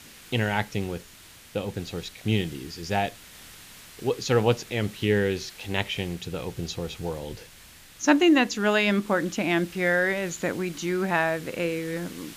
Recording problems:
high frequencies cut off; noticeable; nothing above 7 kHz
hiss; noticeable; throughout; 20 dB below the speech

